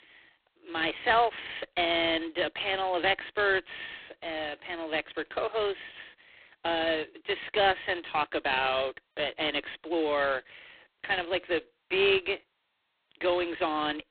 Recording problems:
phone-call audio; poor line
thin; very; fading below 300 Hz

